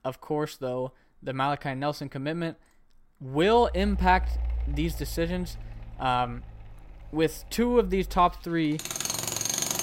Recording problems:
machinery noise; loud; from 3.5 s on; 6 dB below the speech

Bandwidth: 16 kHz